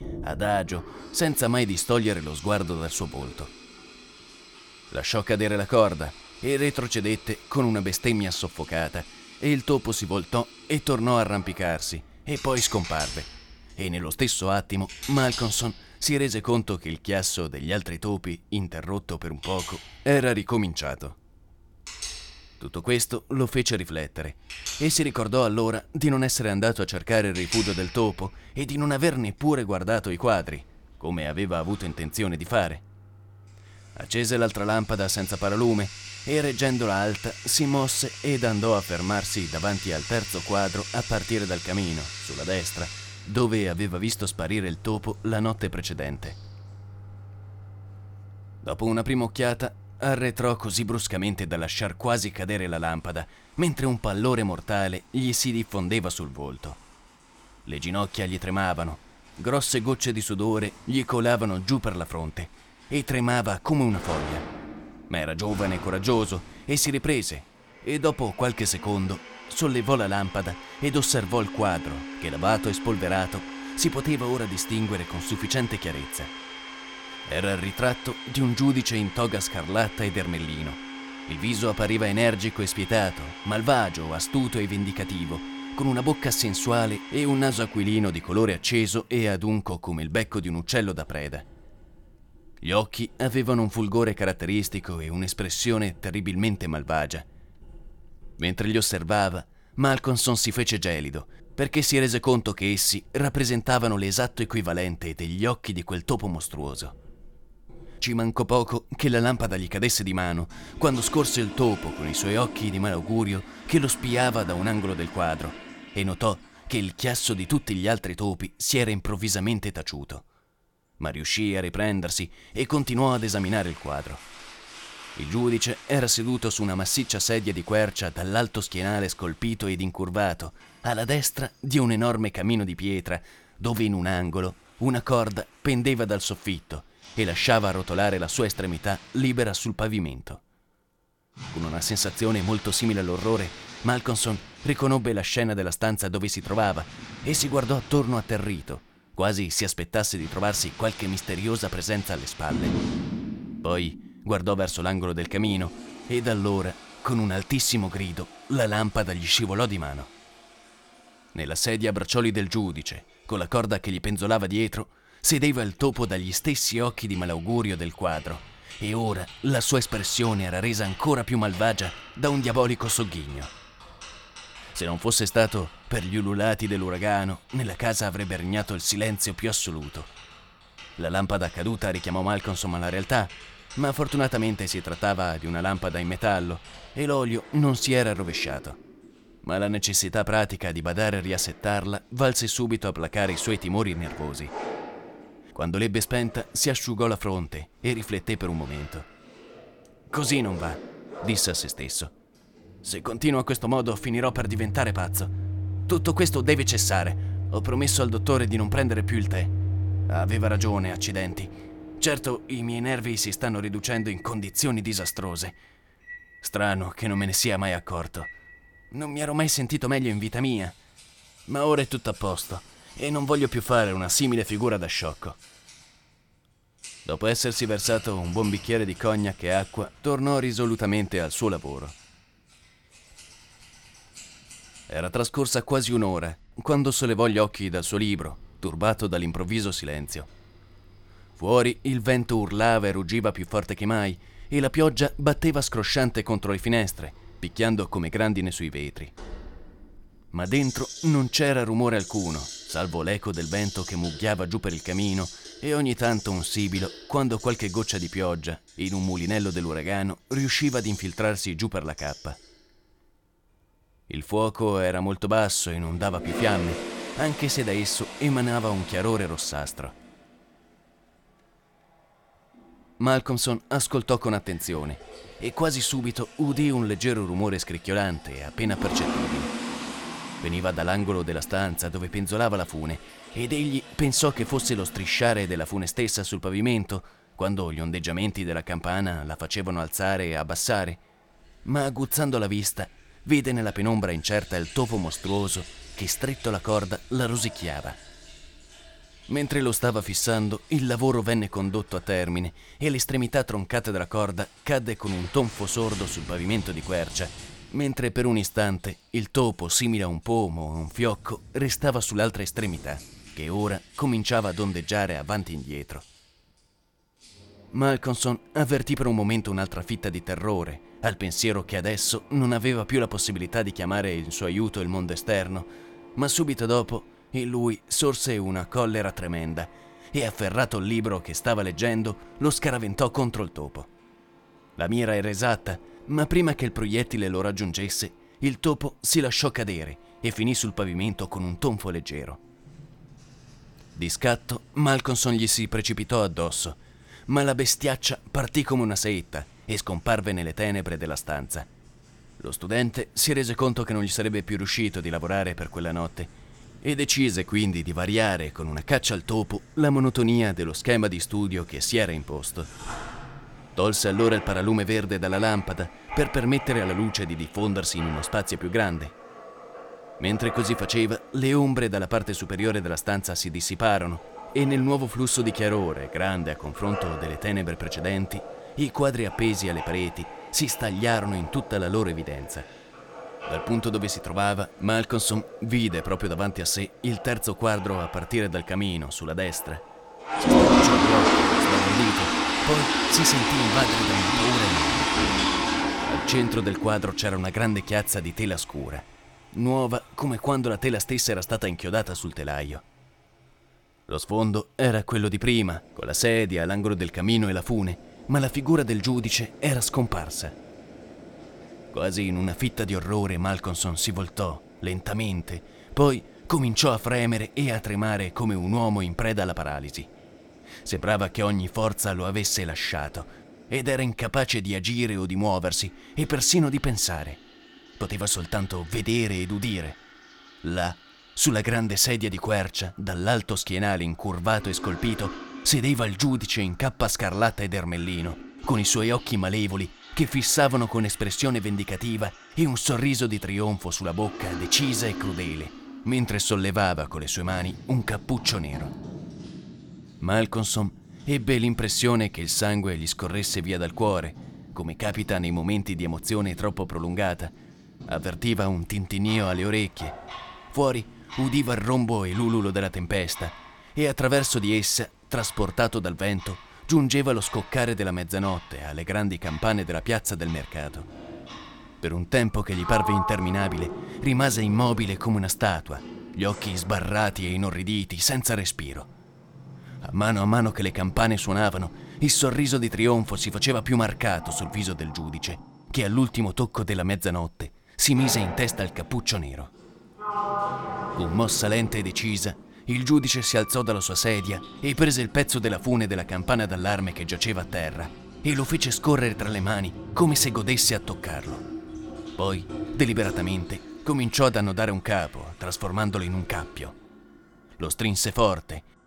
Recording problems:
household noises; loud; throughout; 9 dB below the speech

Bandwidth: 17.5 kHz